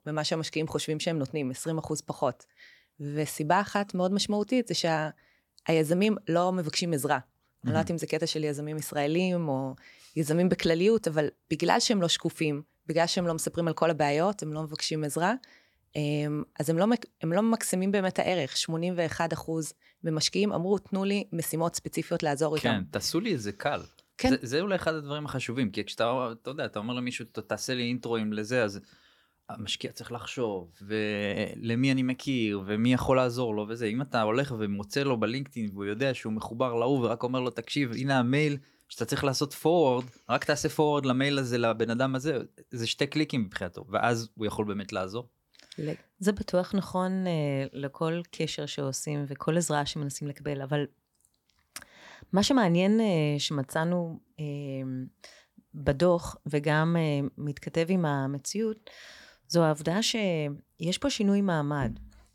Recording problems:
none

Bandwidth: 18 kHz